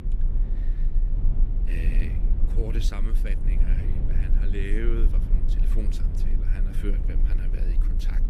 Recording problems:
low rumble; loud; throughout; 4 dB below the speech

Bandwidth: 15 kHz